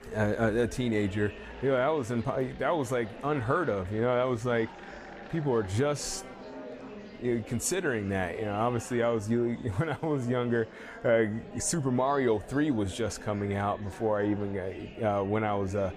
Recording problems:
murmuring crowd; noticeable; throughout; 15 dB below the speech

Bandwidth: 15 kHz